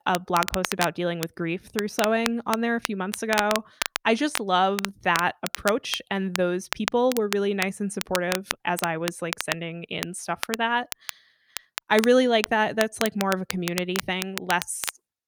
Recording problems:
crackle, like an old record; loud; 7 dB below the speech

